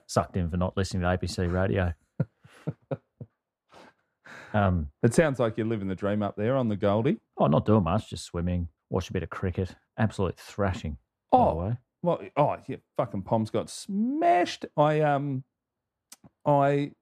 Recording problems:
muffled; slightly; fading above 1.5 kHz

